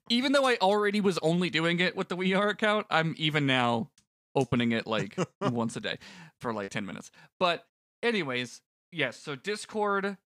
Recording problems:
choppy; occasionally; 1% of the speech affected

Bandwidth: 15.5 kHz